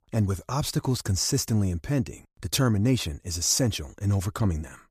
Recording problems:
none

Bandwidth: 14.5 kHz